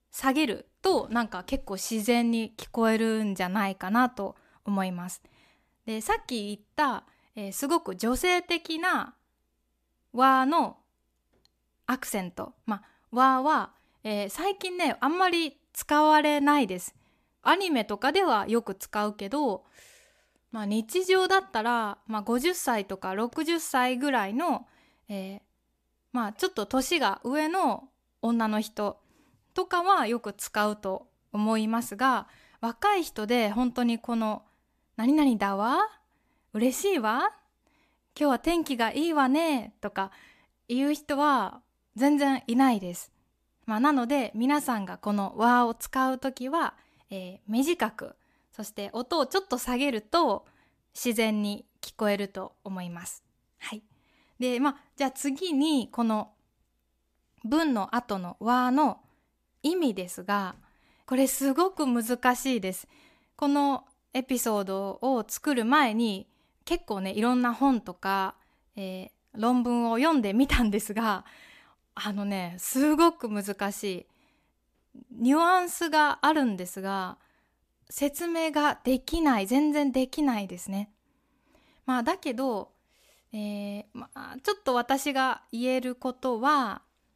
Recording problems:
none

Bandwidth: 14.5 kHz